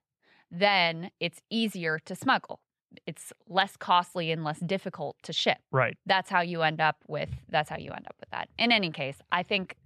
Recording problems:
none

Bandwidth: 13.5 kHz